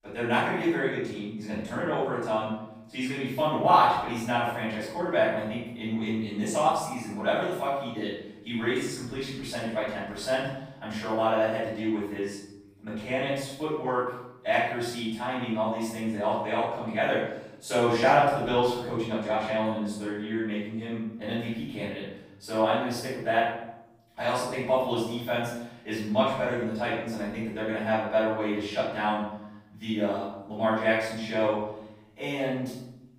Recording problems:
room echo; strong; dies away in 0.8 s
off-mic speech; far

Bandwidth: 15.5 kHz